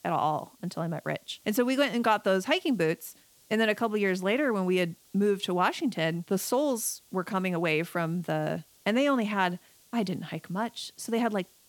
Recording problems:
hiss; faint; throughout; 30 dB below the speech

